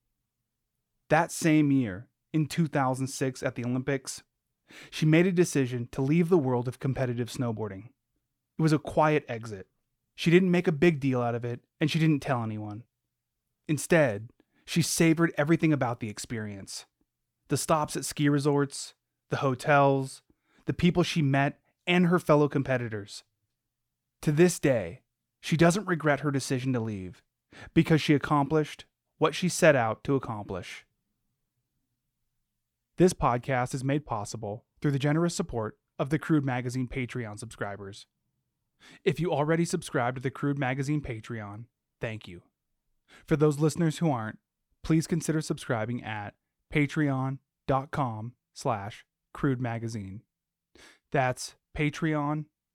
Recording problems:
none

